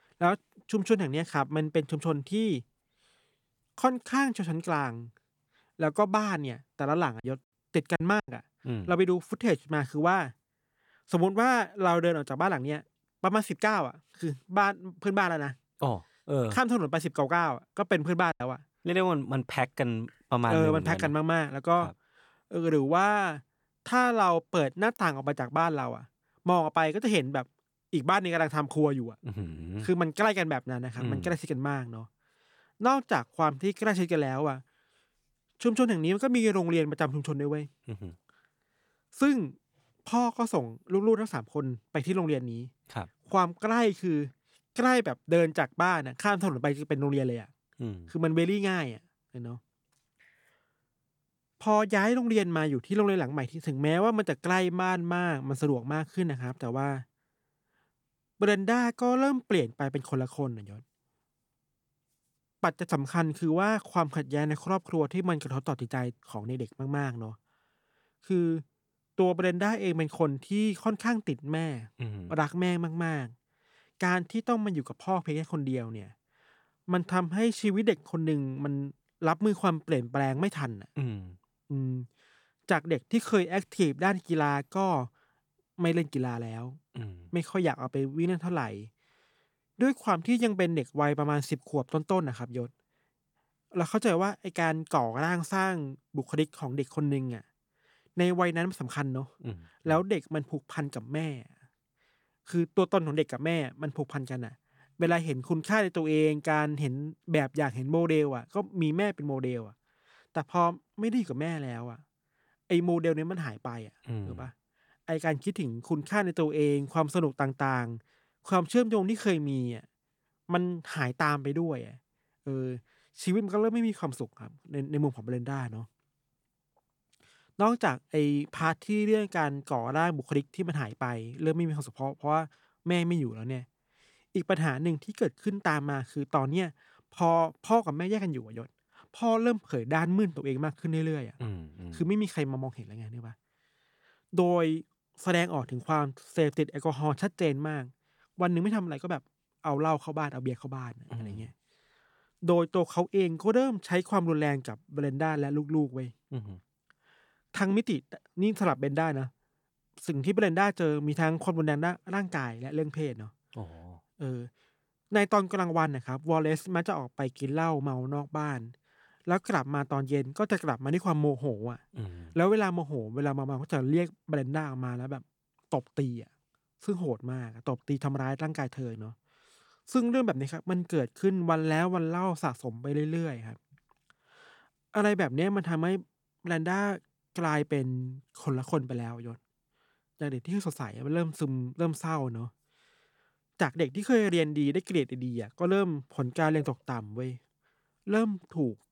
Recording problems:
choppy; very; from 7 to 8.5 s and at 18 s; 9% of the speech affected

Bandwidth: 18.5 kHz